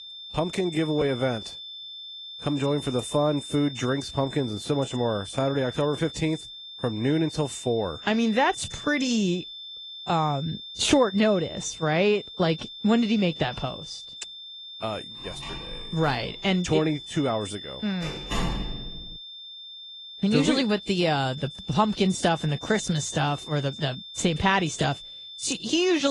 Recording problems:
garbled, watery; slightly
high-pitched whine; noticeable; throughout; 3.5 kHz, 10 dB below the speech
door banging; noticeable; from 15 to 19 s; peak 4 dB below the speech
abrupt cut into speech; at the end

